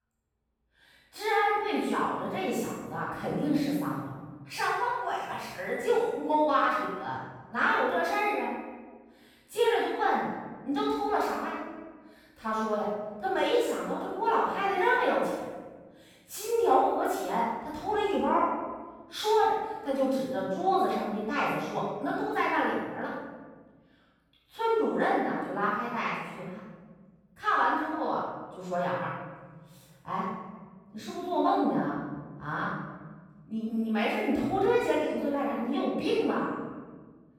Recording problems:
room echo; strong; dies away in 1.5 s
off-mic speech; far

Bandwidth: 18 kHz